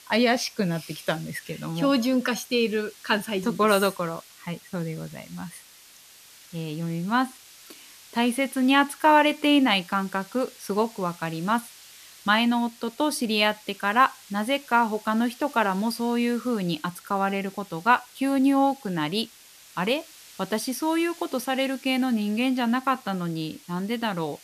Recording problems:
hiss; faint; throughout; 20 dB below the speech

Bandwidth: 14.5 kHz